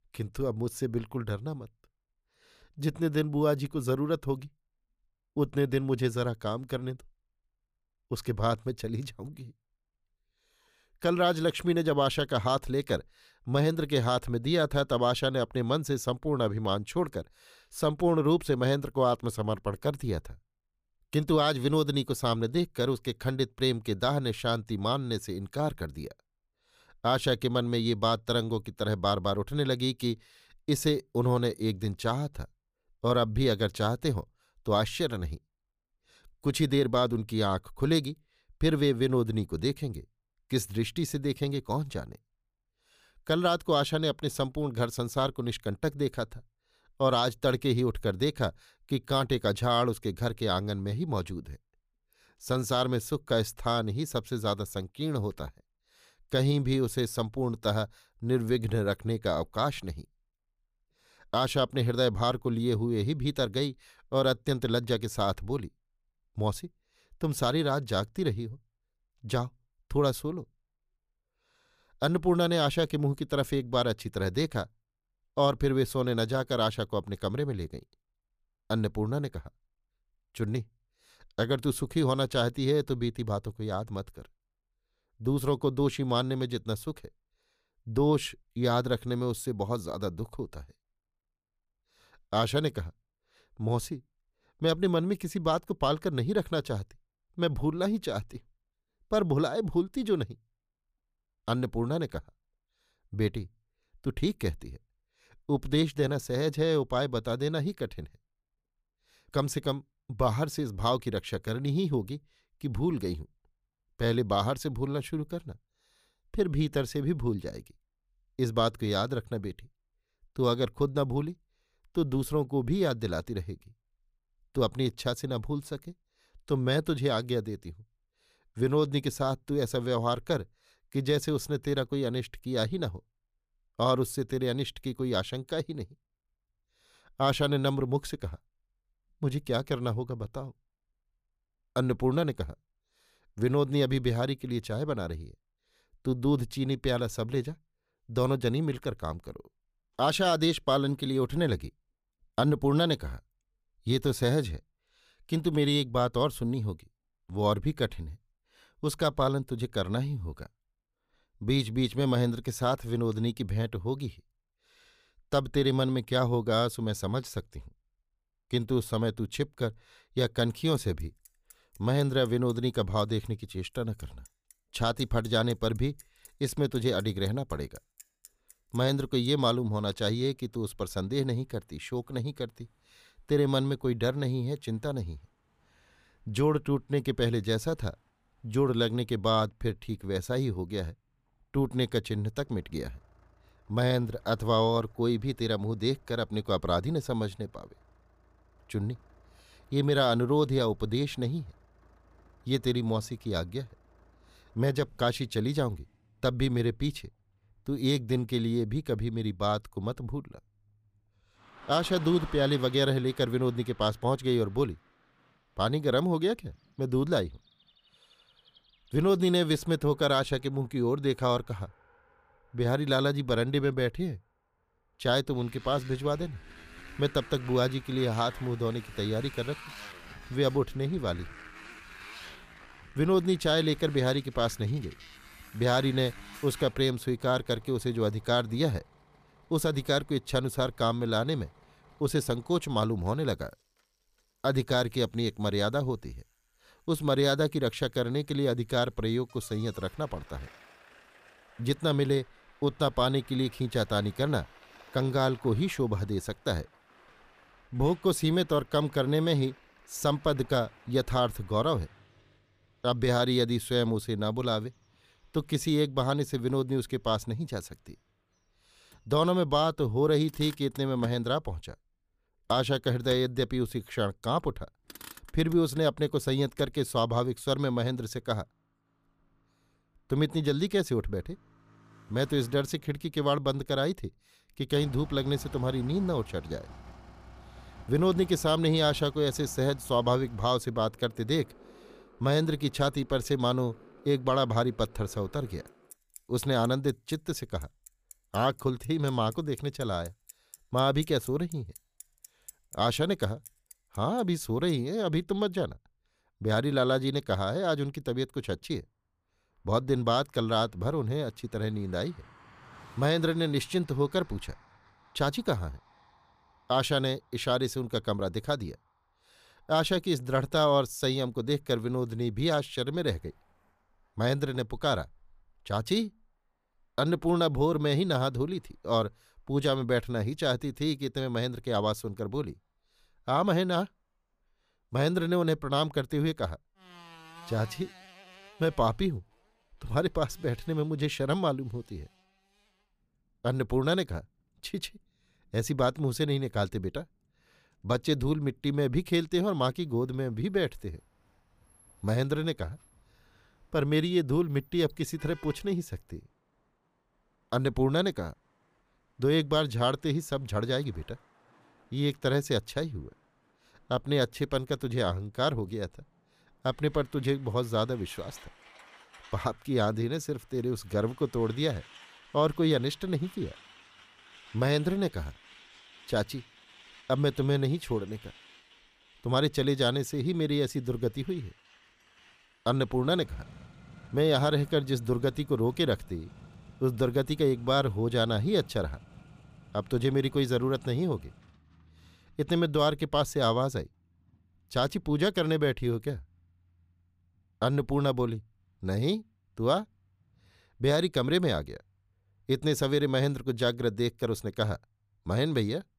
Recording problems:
traffic noise; faint; from 2:51 on; 25 dB below the speech

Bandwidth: 15 kHz